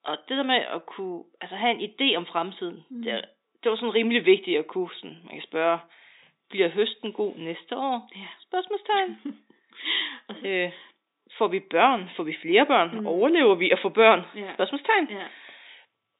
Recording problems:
high frequencies cut off; severe; nothing above 4 kHz
thin; very slightly; fading below 300 Hz

